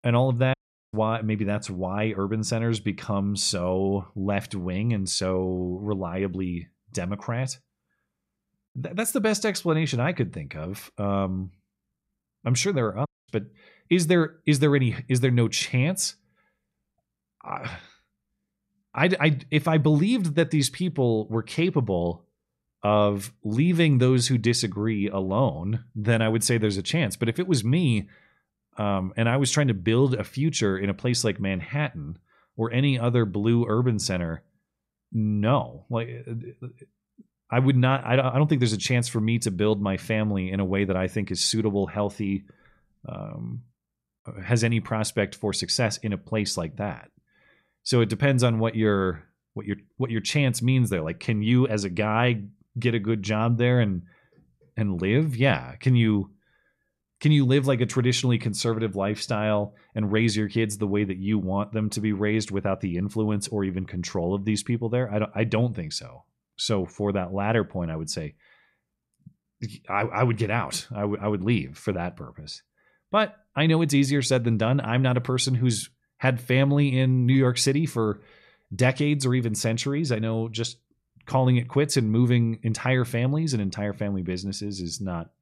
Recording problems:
audio cutting out; at 0.5 s and at 13 s

